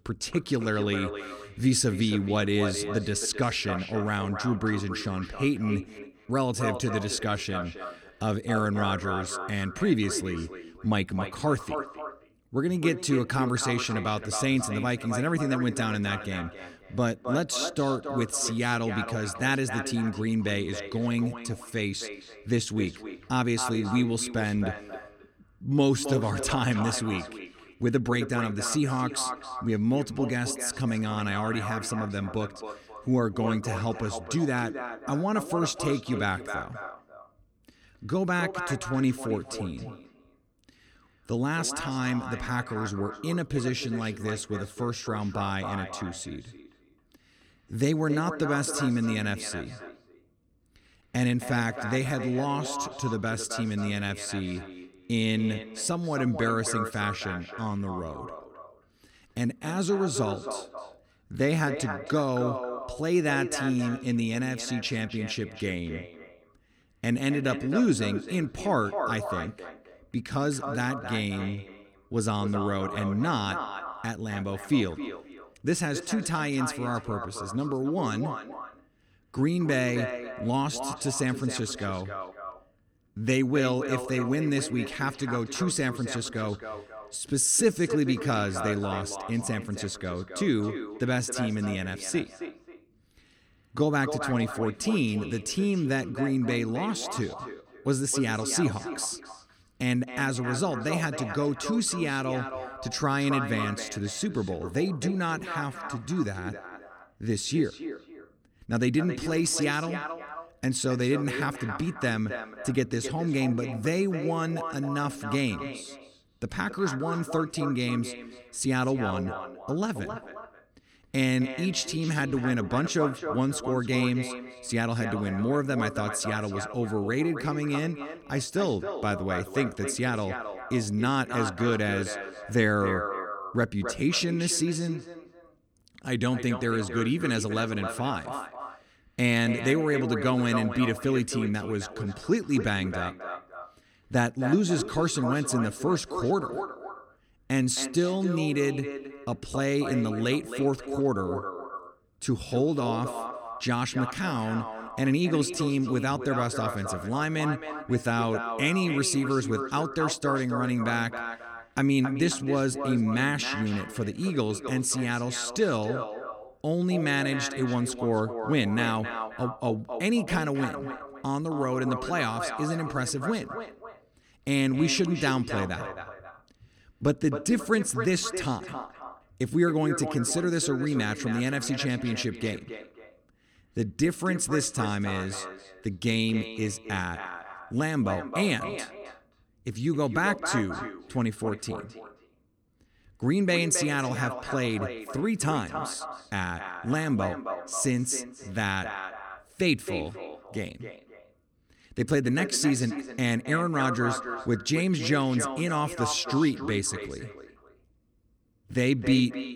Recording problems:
echo of what is said; strong; throughout; 270 ms later, 9 dB below the speech

